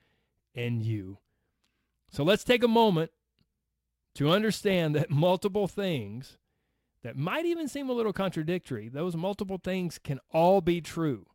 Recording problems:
none

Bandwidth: 16 kHz